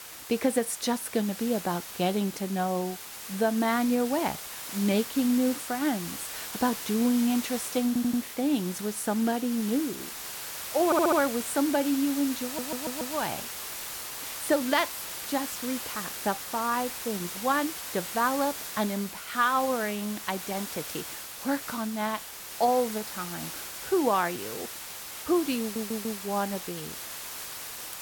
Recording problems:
hiss; loud; throughout; 7 dB below the speech
audio stuttering; 4 times, first at 8 s

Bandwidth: 17.5 kHz